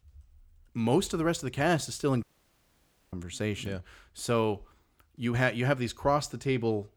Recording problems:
audio cutting out; at 2 s for 1 s

